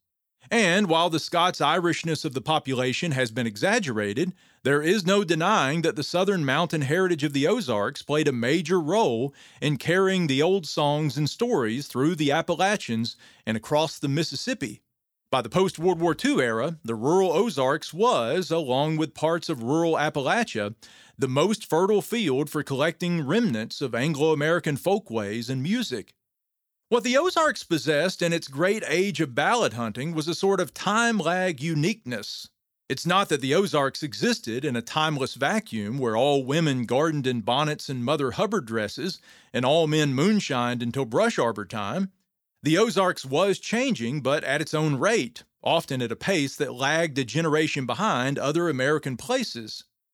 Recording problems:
none

